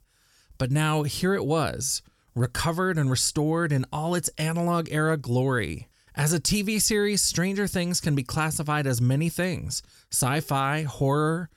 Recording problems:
none

